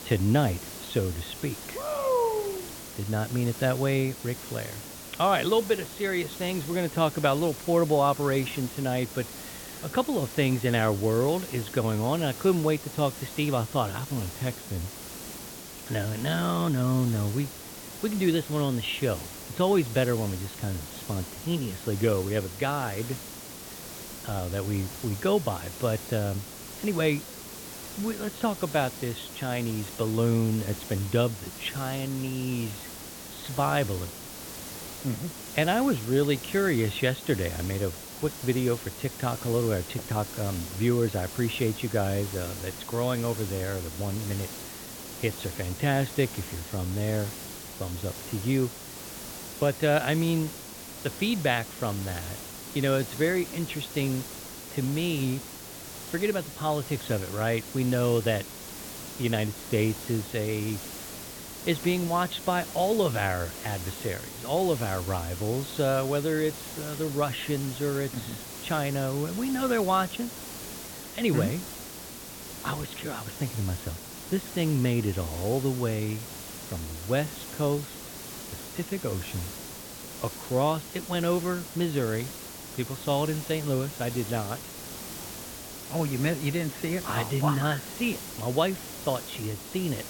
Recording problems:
high frequencies cut off; severe; nothing above 4 kHz
hiss; loud; throughout; 10 dB below the speech

